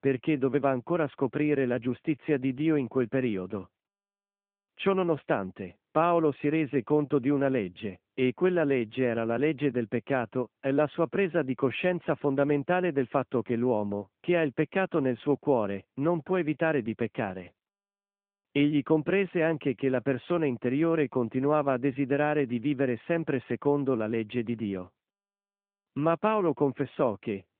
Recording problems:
phone-call audio

